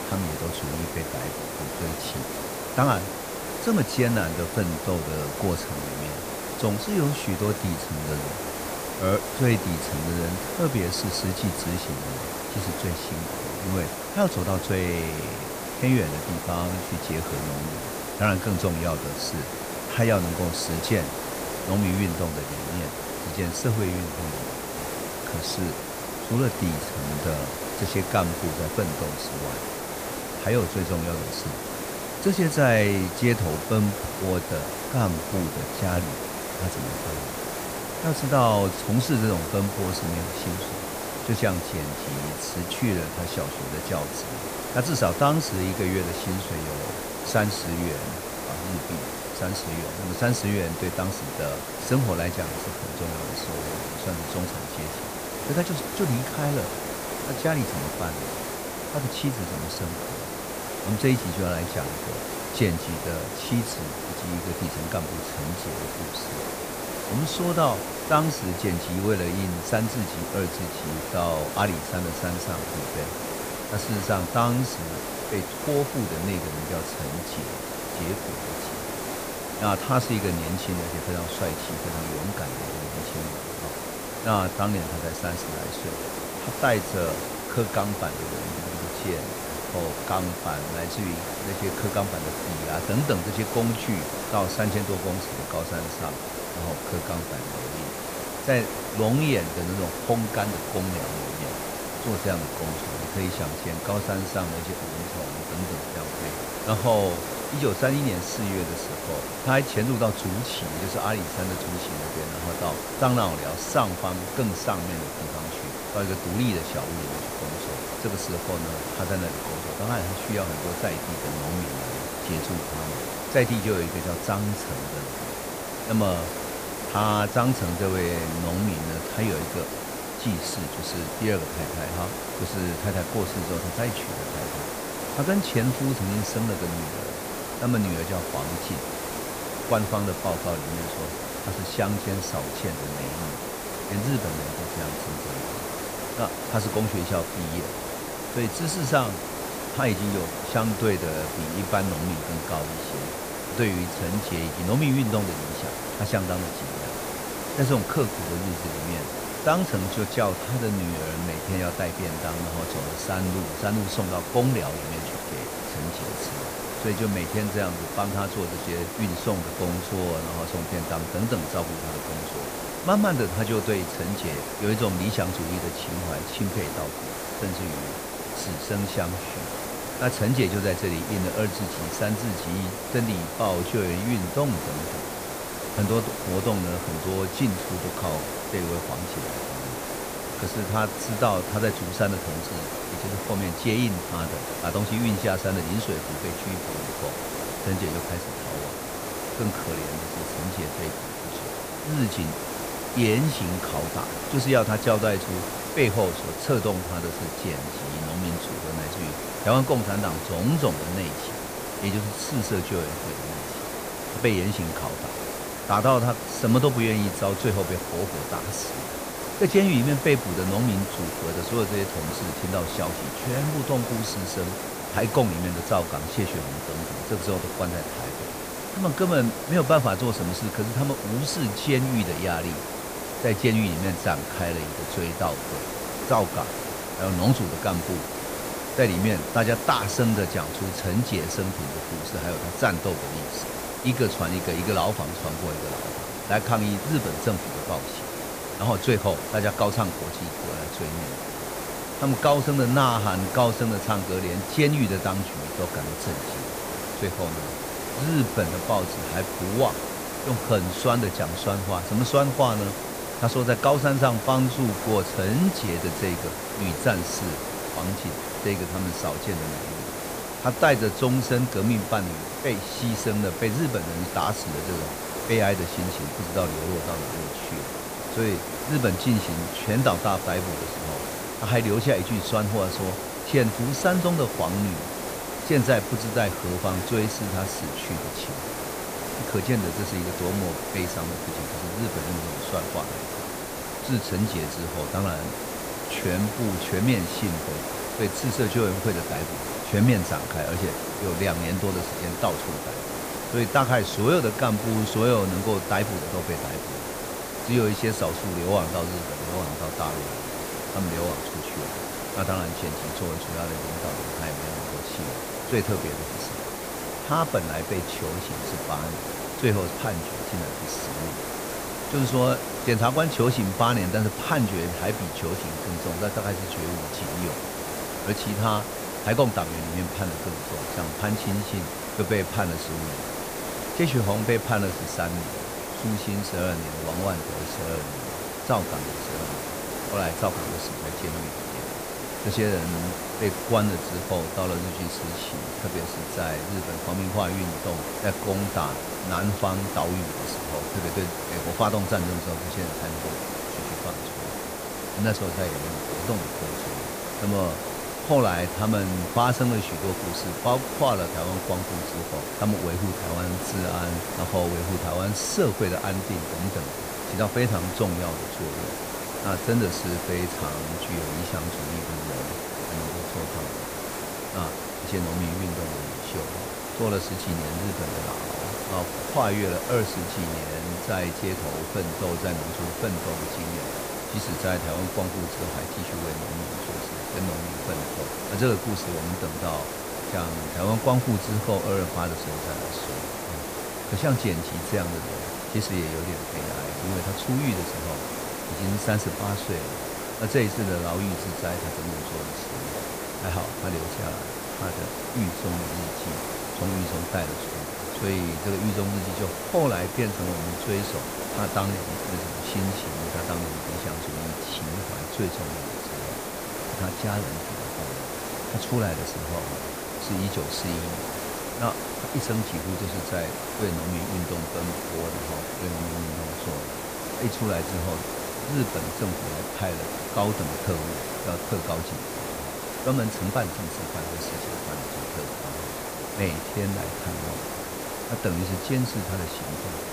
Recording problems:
hiss; loud; throughout; 3 dB below the speech
audio stuttering; at 1:28

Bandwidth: 15 kHz